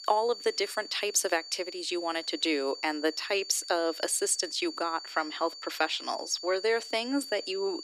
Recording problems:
thin; somewhat; fading below 300 Hz
high-pitched whine; noticeable; throughout; 4.5 kHz, 10 dB below the speech

